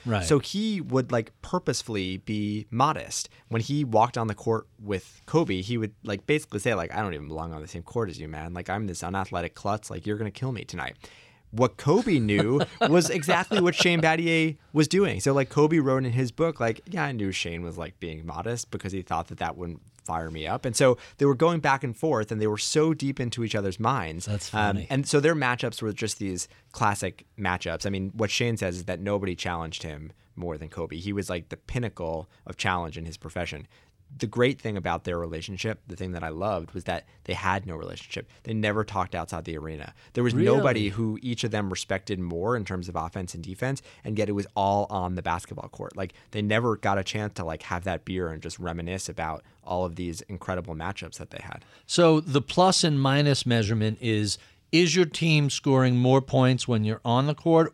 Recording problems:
none

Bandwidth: 16.5 kHz